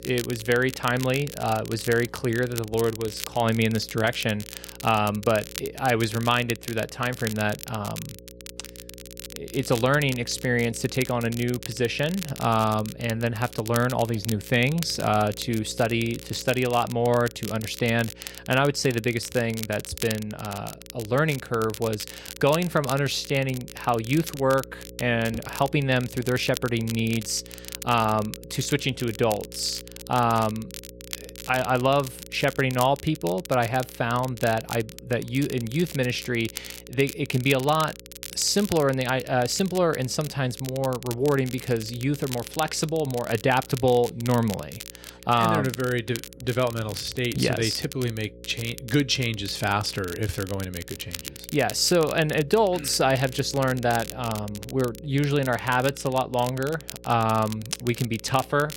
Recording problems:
crackle, like an old record; noticeable; 15 dB below the speech
electrical hum; faint; throughout; 60 Hz, 25 dB below the speech

